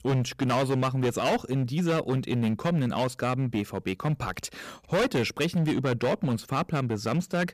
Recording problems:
distortion; heavy; 14% of the sound clipped

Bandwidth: 14.5 kHz